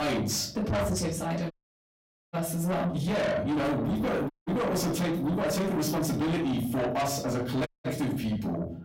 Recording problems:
distortion; heavy; 6 dB below the speech
off-mic speech; far
room echo; slight; dies away in 0.5 s
abrupt cut into speech; at the start
audio cutting out; at 1.5 s for 1 s, at 4.5 s and at 7.5 s

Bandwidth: 16 kHz